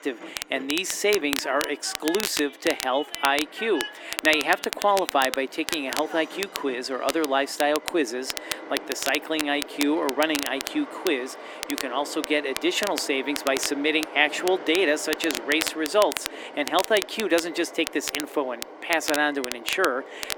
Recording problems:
thin; somewhat; fading below 300 Hz
crackle, like an old record; loud; 8 dB below the speech
train or aircraft noise; noticeable; throughout; 15 dB below the speech

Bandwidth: 18 kHz